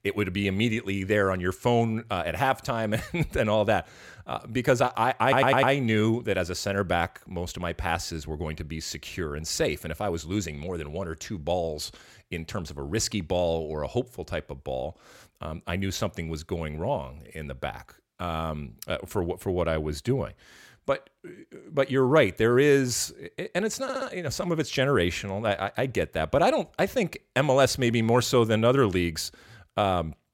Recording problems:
audio stuttering; at 5 s and at 24 s

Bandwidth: 16.5 kHz